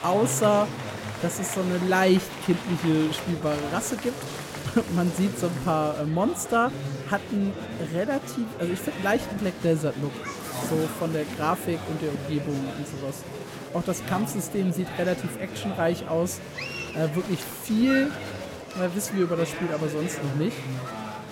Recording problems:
murmuring crowd; loud; throughout; 8 dB below the speech
household noises; noticeable; until 6 s; 15 dB below the speech

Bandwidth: 16.5 kHz